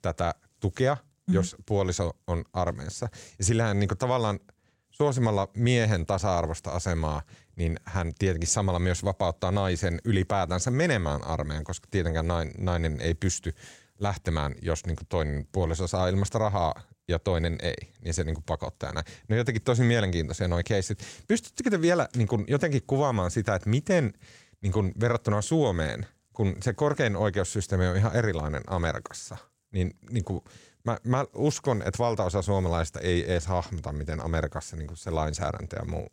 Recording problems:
none

